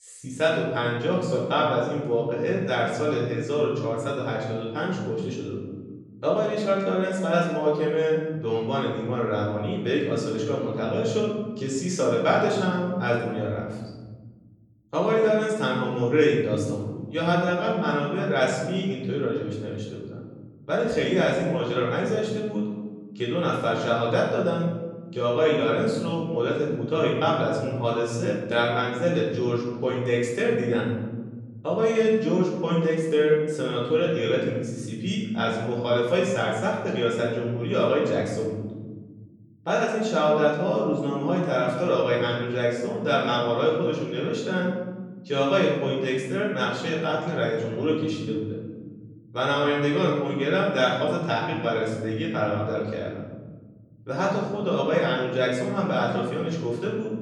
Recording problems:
off-mic speech; far
room echo; noticeable; dies away in 1.6 s

